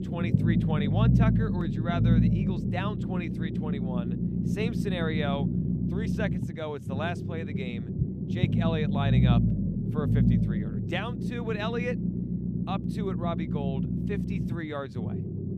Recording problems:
low rumble; loud; throughout; 1 dB below the speech

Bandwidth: 14.5 kHz